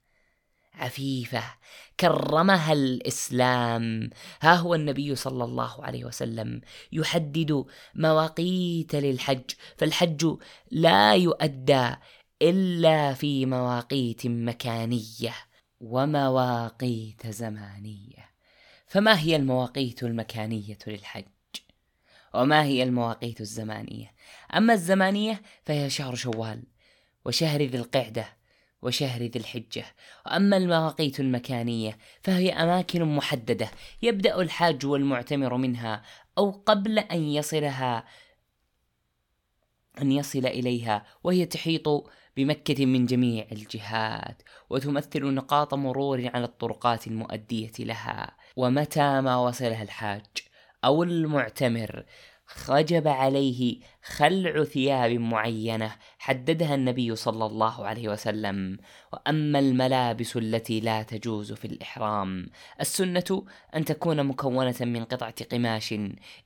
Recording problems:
none

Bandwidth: 18 kHz